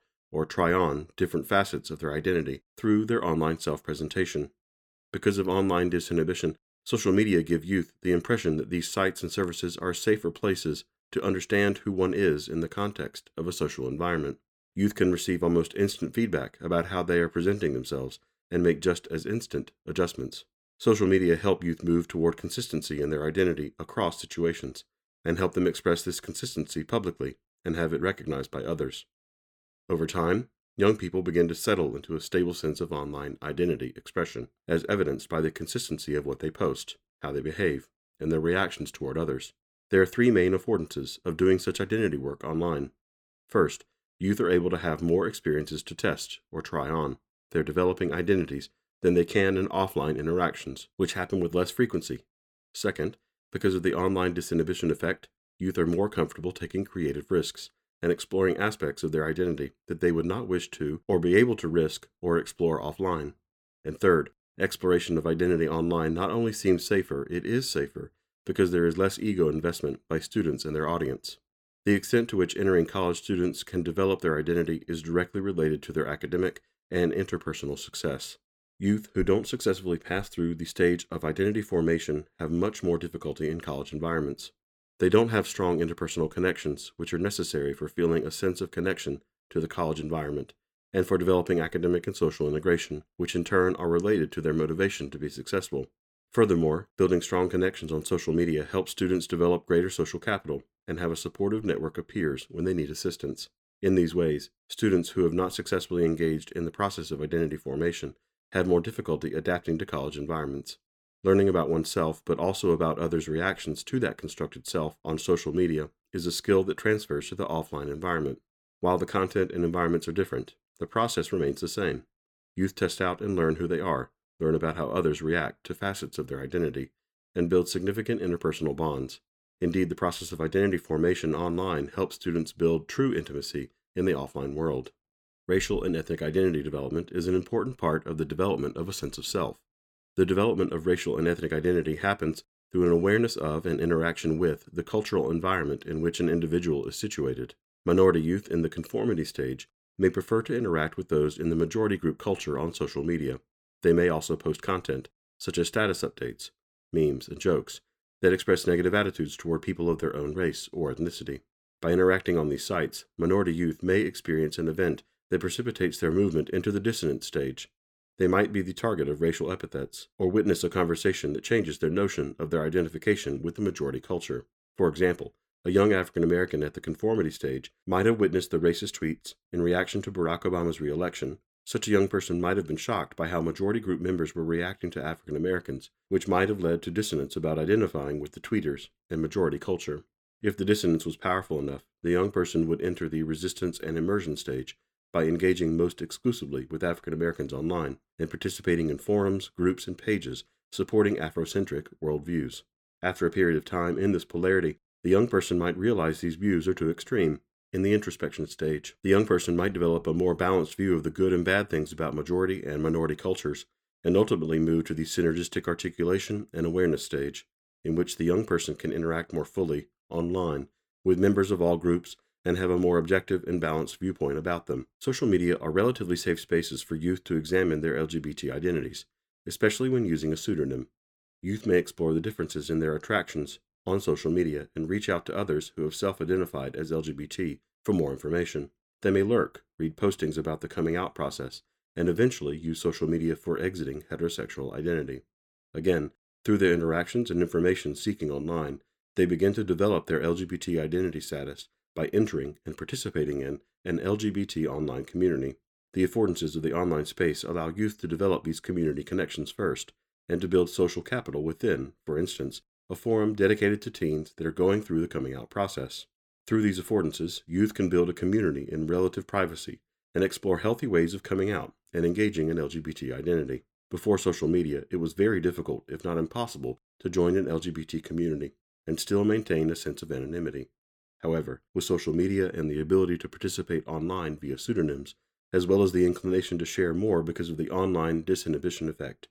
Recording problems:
none

